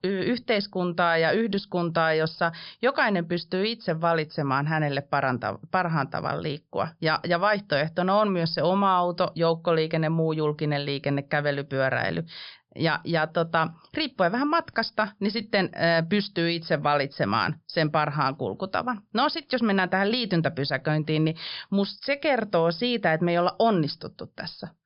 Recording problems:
high frequencies cut off; noticeable; nothing above 5.5 kHz

